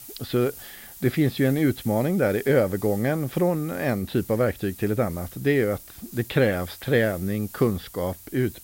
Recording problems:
high frequencies cut off; noticeable; nothing above 5.5 kHz
hiss; noticeable; throughout; 15 dB below the speech

